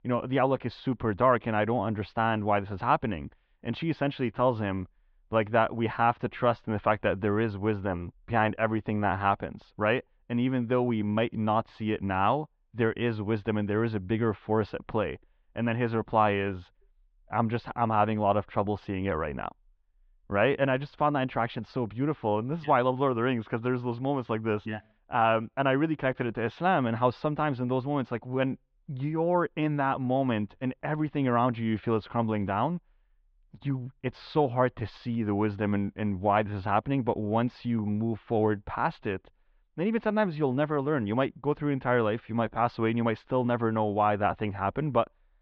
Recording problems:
muffled; very; fading above 3.5 kHz

